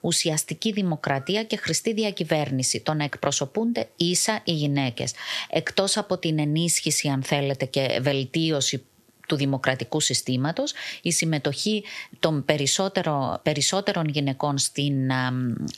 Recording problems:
squashed, flat; somewhat

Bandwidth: 13.5 kHz